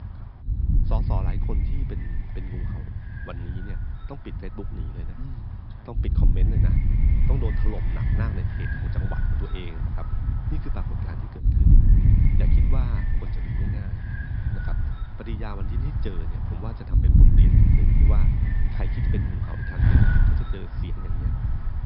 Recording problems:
high frequencies cut off; noticeable; nothing above 5.5 kHz
wind noise on the microphone; heavy; 4 dB above the speech

